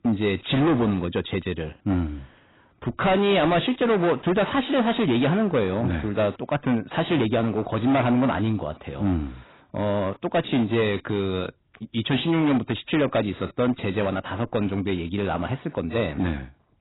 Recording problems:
distortion; heavy; 11% of the sound clipped
garbled, watery; badly; nothing above 4 kHz

